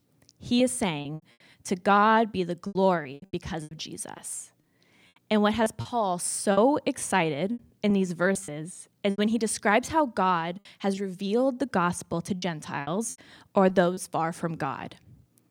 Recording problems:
choppy; very; 8% of the speech affected

